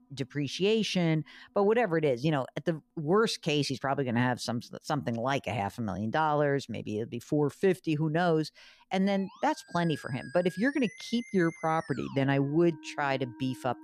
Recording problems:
background music; noticeable; throughout; 20 dB below the speech

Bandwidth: 14.5 kHz